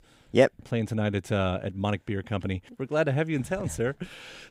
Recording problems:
none

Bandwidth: 15.5 kHz